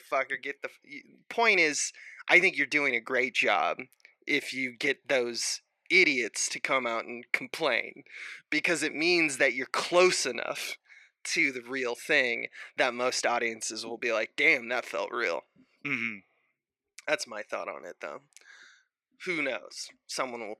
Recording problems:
thin; somewhat; fading below 450 Hz

